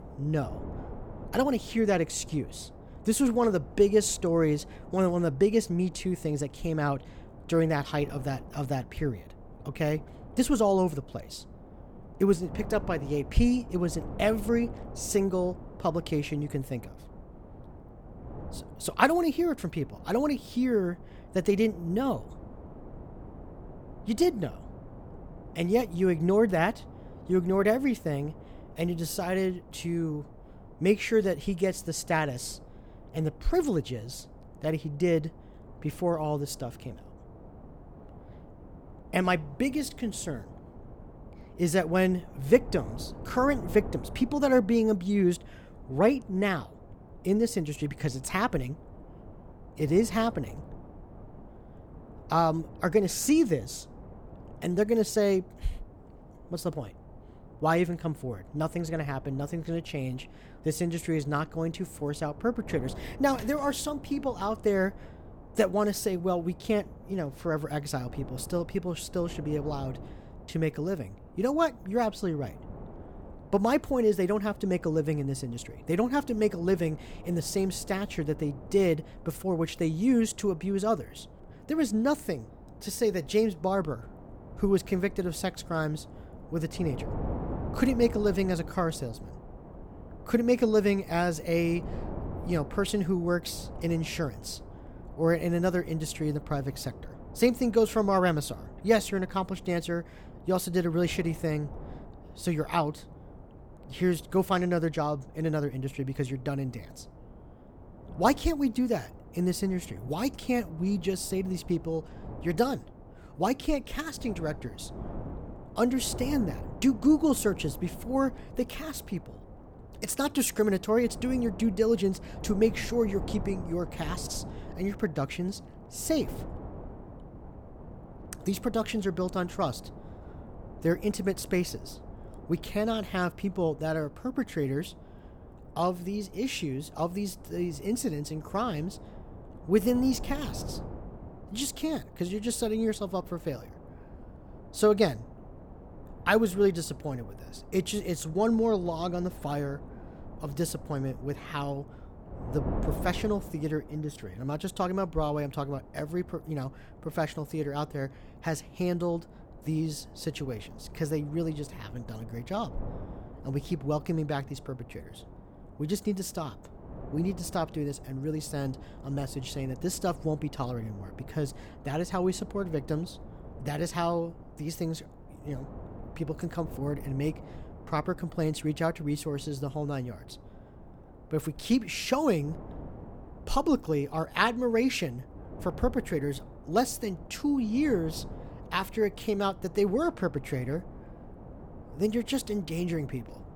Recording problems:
wind noise on the microphone; occasional gusts; 20 dB below the speech

